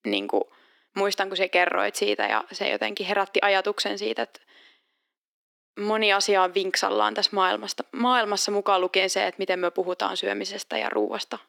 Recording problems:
thin; somewhat; fading below 300 Hz

